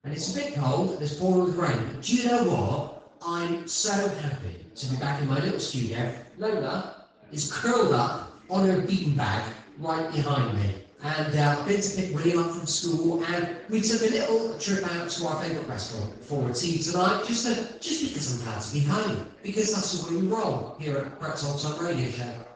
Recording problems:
off-mic speech; far
room echo; noticeable; dies away in 0.6 s
garbled, watery; slightly
voice in the background; faint; throughout; 20 dB below the speech

